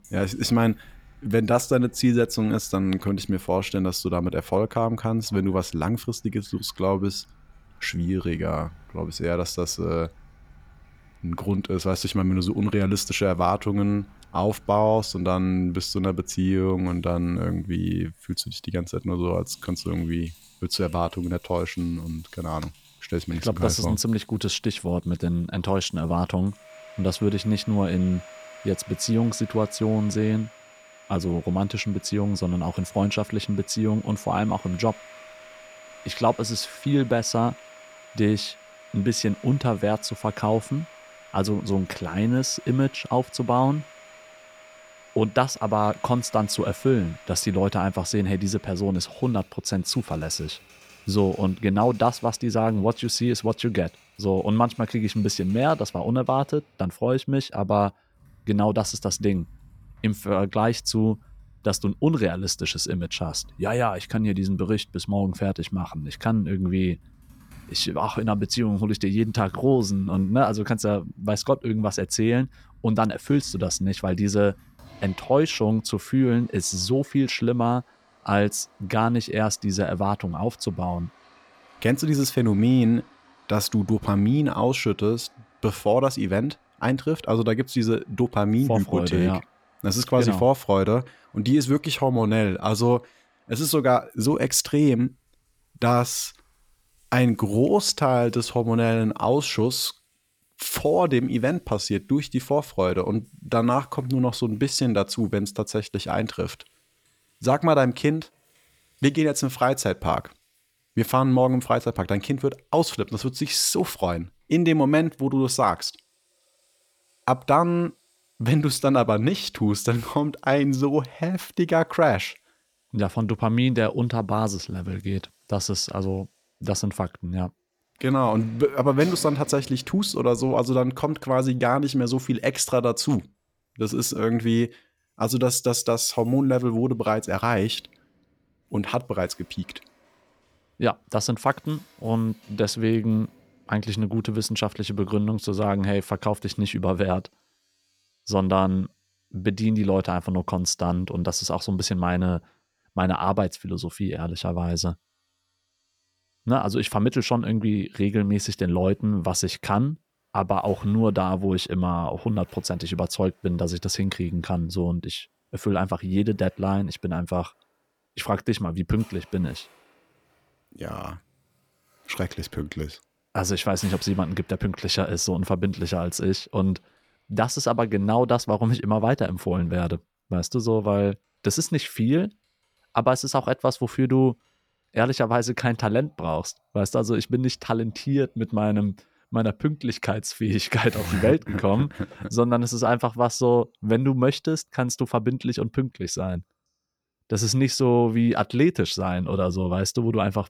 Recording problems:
household noises; faint; throughout; 25 dB below the speech

